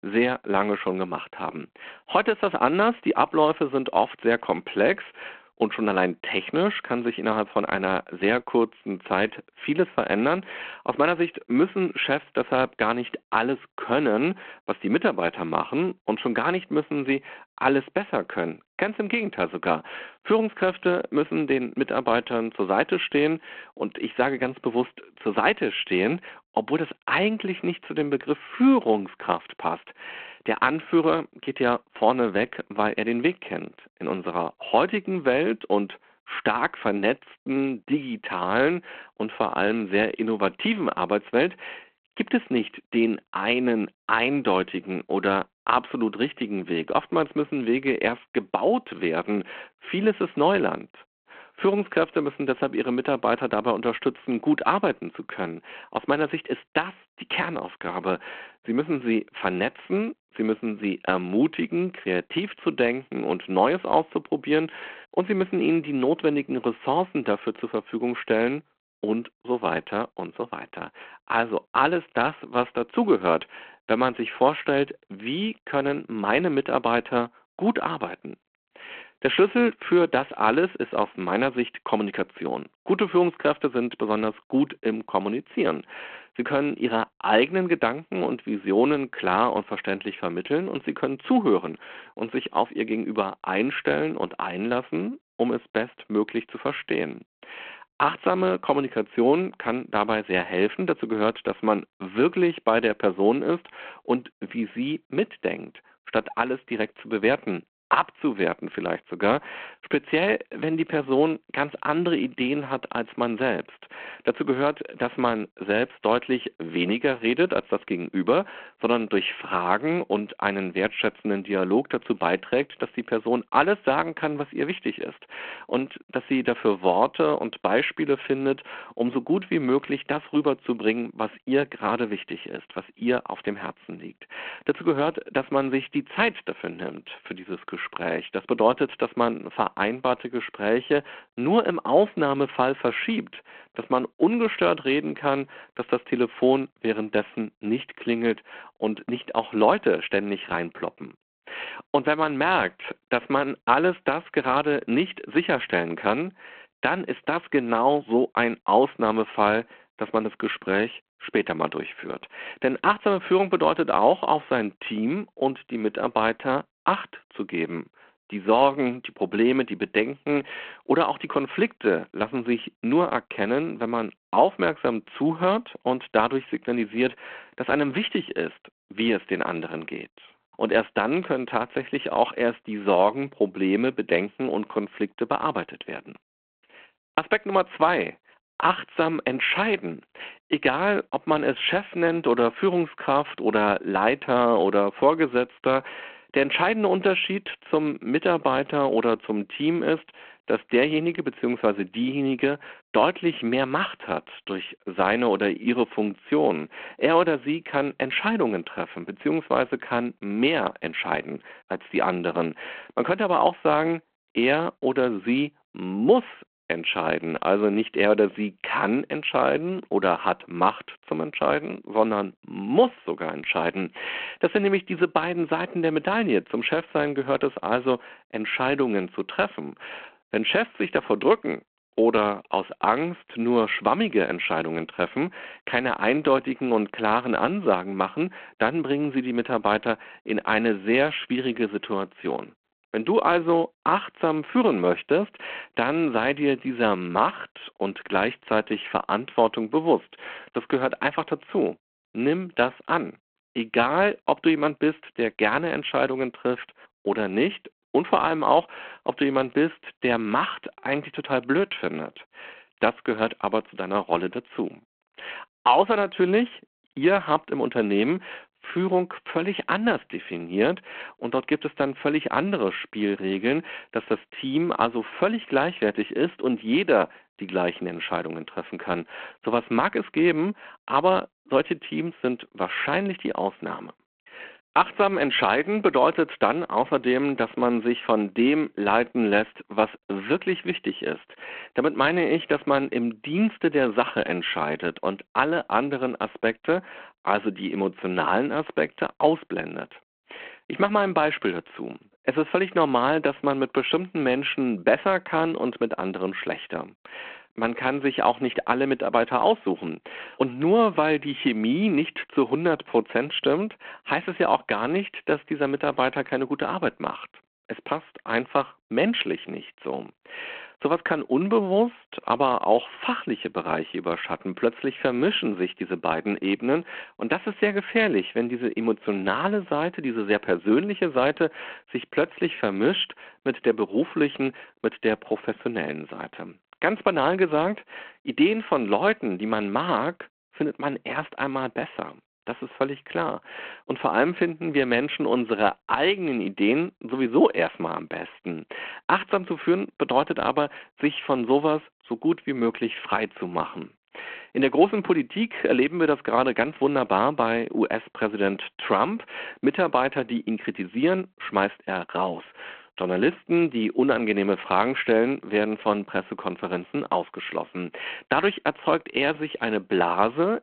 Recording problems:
phone-call audio

